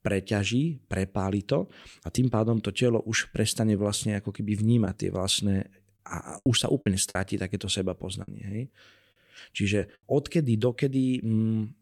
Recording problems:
choppy; occasionally; 2% of the speech affected

